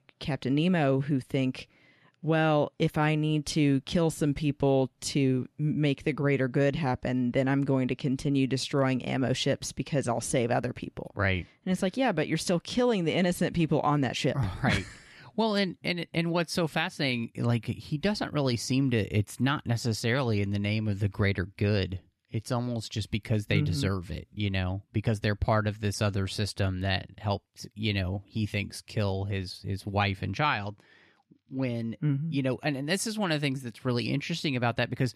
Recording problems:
none

